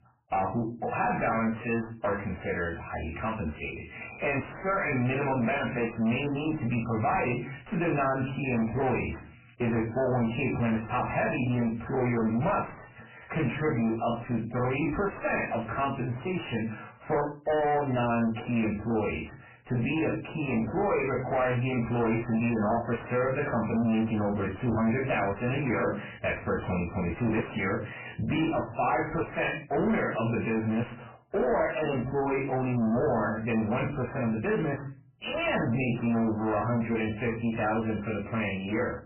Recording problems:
distortion; heavy; 6 dB below the speech
off-mic speech; far
garbled, watery; badly; nothing above 2.5 kHz
room echo; very slight; dies away in 0.3 s

